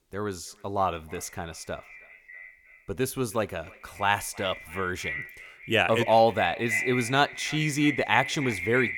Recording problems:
echo of what is said; strong; throughout; 320 ms later, 7 dB below the speech

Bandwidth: 18.5 kHz